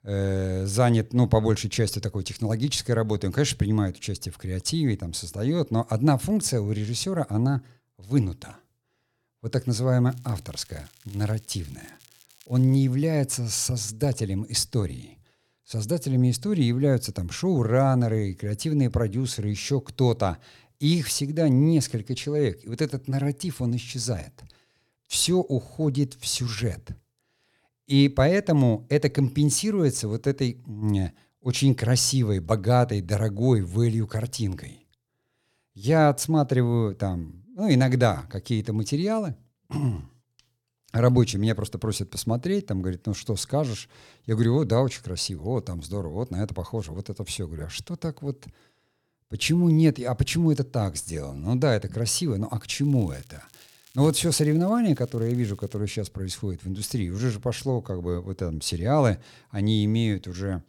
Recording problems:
crackling; faint; from 10 to 13 s and from 53 to 56 s; 30 dB below the speech

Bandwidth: 18 kHz